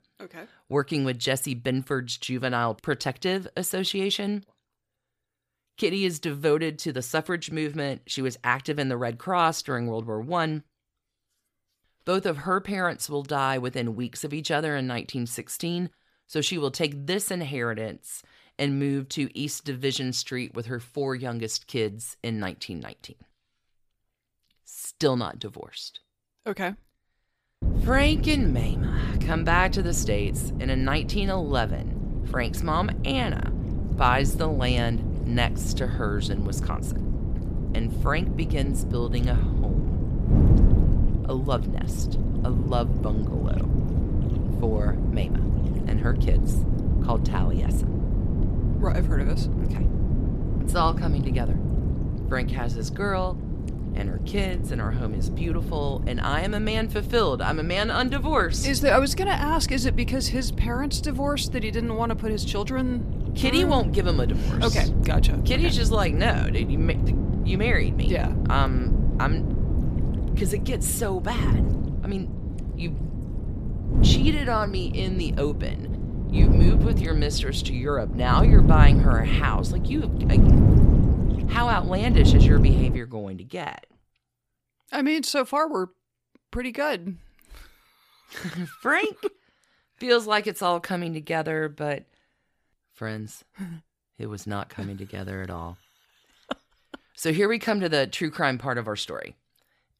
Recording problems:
wind noise on the microphone; heavy; from 28 s to 1:23; 8 dB below the speech

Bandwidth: 15 kHz